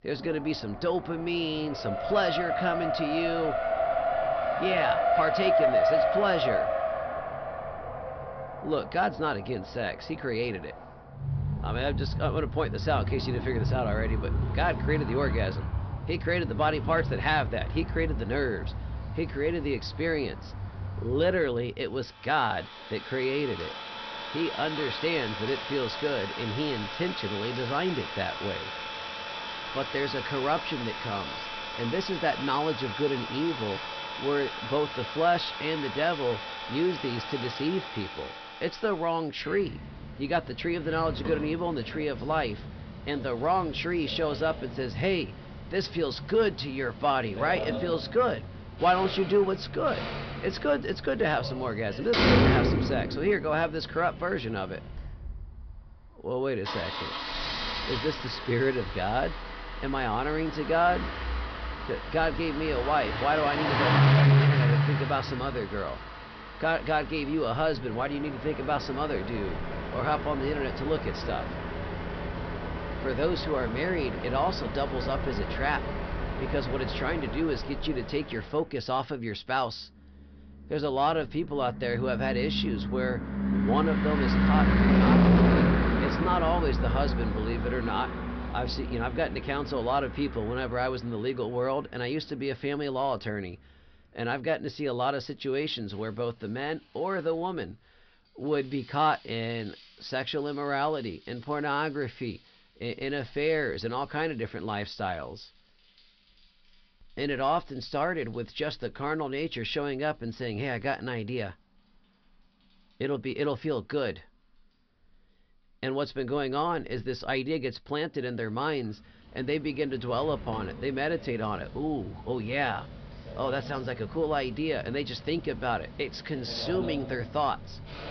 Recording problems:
high frequencies cut off; noticeable; nothing above 5.5 kHz
distortion; slight; 10 dB below the speech
traffic noise; loud; throughout; 1 dB below the speech

